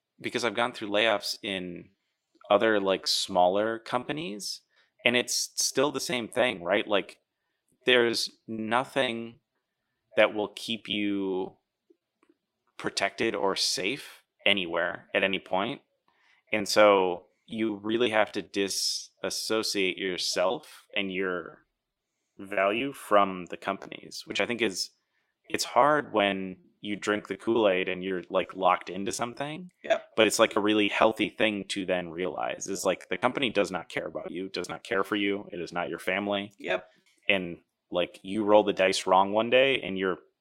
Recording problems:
thin; somewhat; fading below 300 Hz
choppy; very; 14% of the speech affected

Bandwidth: 16 kHz